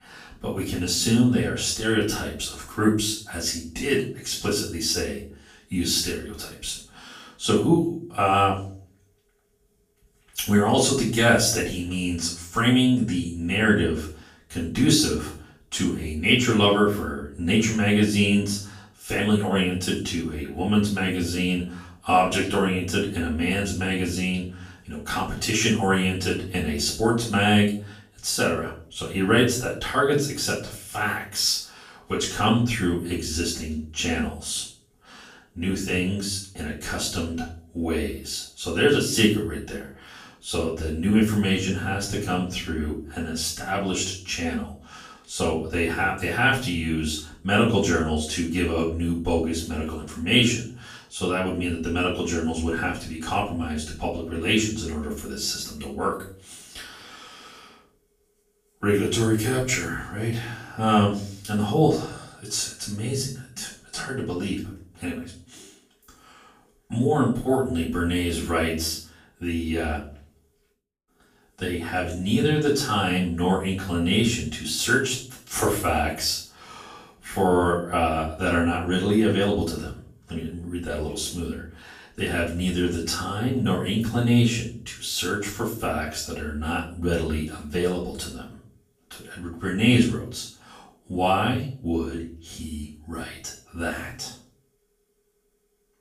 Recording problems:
off-mic speech; far
room echo; noticeable; dies away in 0.4 s

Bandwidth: 15 kHz